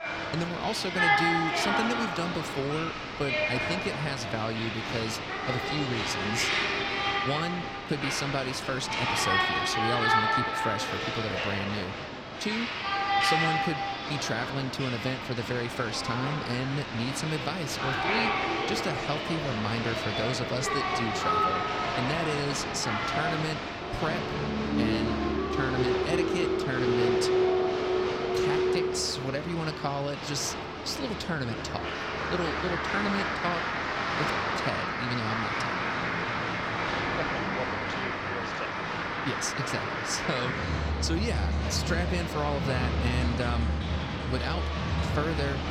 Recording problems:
crowd noise; very loud; throughout; 4 dB above the speech

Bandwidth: 18 kHz